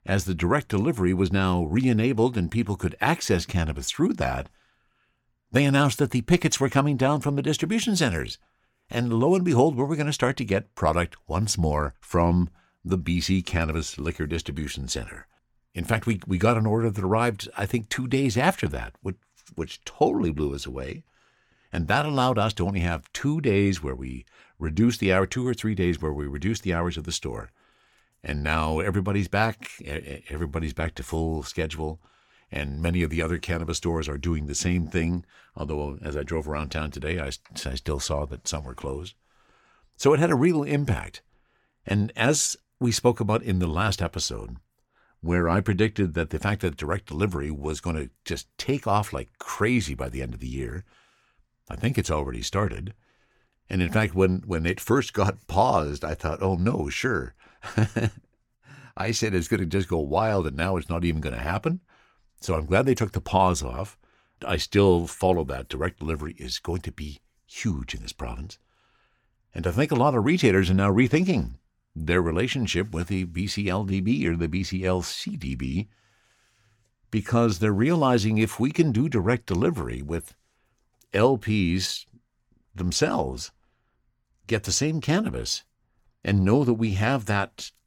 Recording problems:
none

